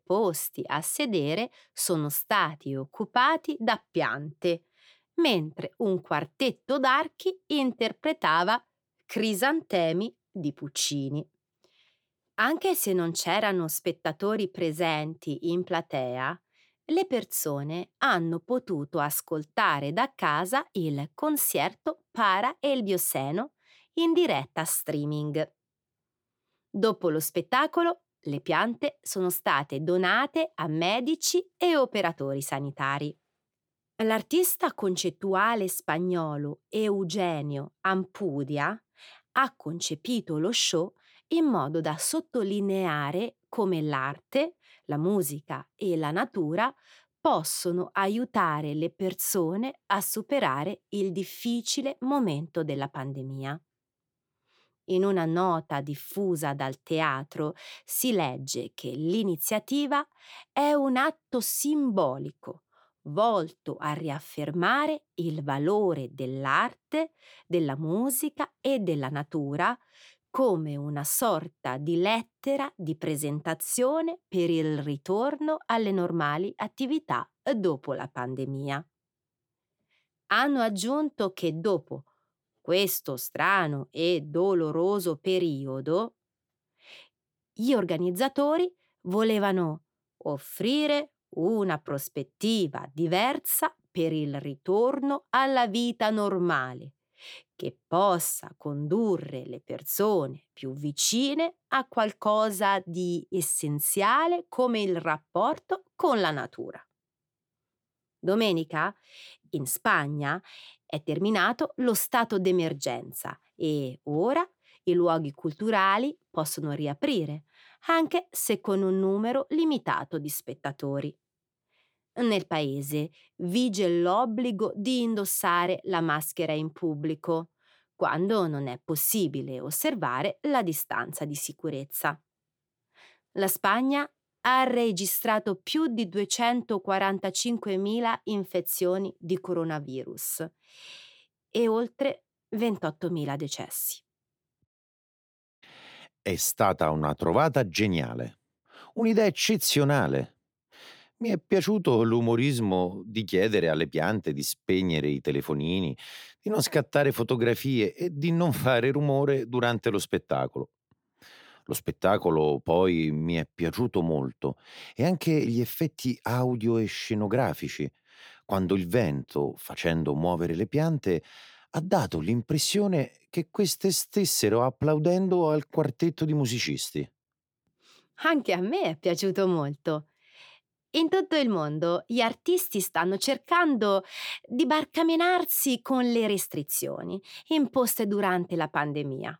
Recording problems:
none

